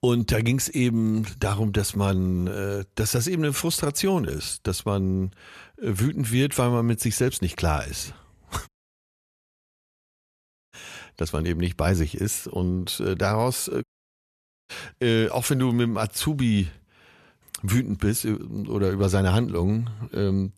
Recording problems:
audio cutting out; at 8.5 s for 2 s and at 14 s for 1 s

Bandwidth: 13.5 kHz